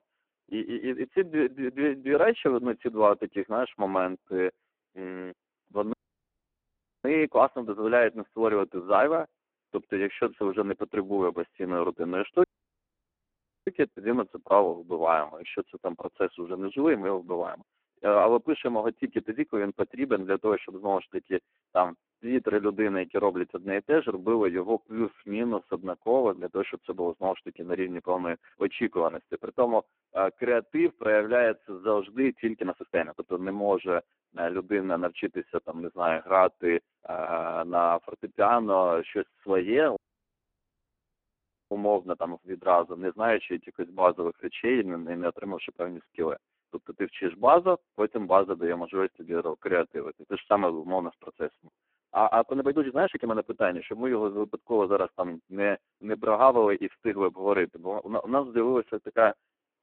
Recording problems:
phone-call audio; poor line
uneven, jittery; strongly; from 4 to 53 s
audio cutting out; at 6 s for 1 s, at 12 s for 1 s and at 40 s for 1.5 s

